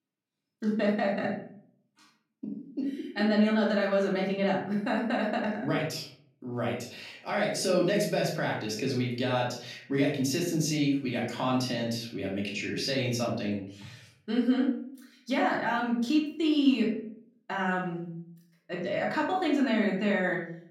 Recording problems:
off-mic speech; far
room echo; noticeable; dies away in 0.5 s

